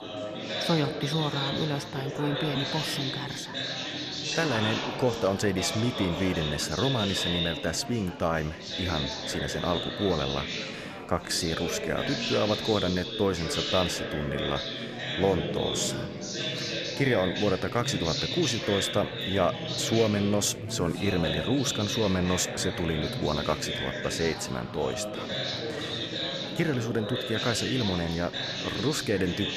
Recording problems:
chatter from many people; loud; throughout; 3 dB below the speech

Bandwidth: 14 kHz